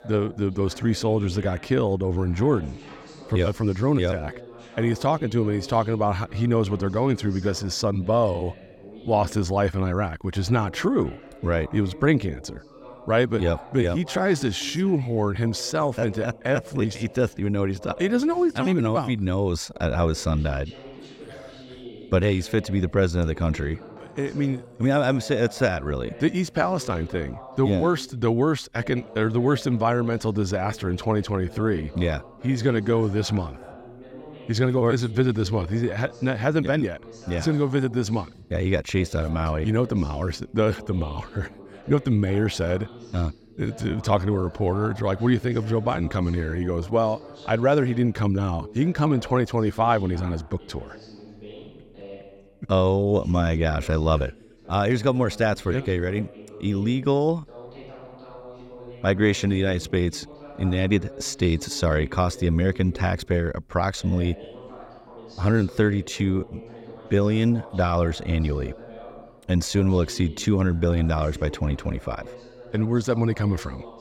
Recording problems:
voice in the background; noticeable; throughout; 20 dB below the speech

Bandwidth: 16 kHz